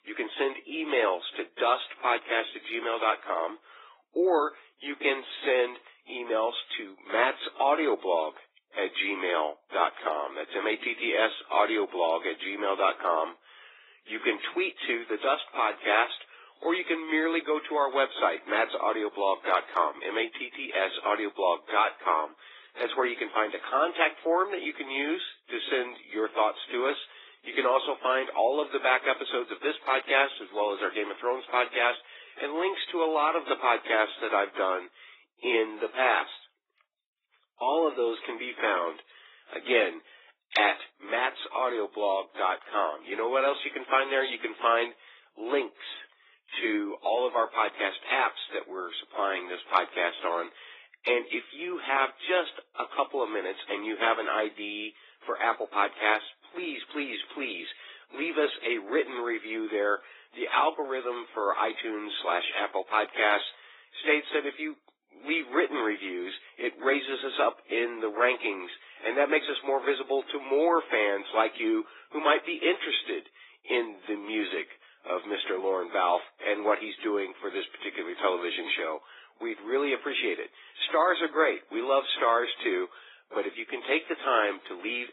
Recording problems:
garbled, watery; badly; nothing above 3.5 kHz
thin; very; fading below 300 Hz

